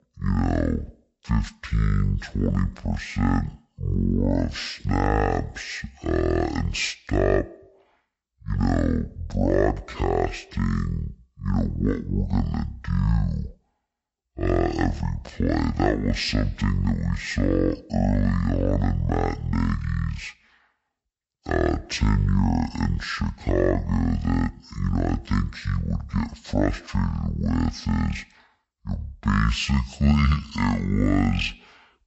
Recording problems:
wrong speed and pitch; too slow and too low; 0.5 times normal speed

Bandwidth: 8 kHz